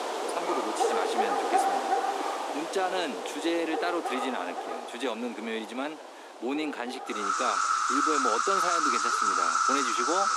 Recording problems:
thin; very slightly; fading below 250 Hz
animal sounds; very loud; throughout; 6 dB above the speech
voice in the background; noticeable; throughout; 20 dB below the speech

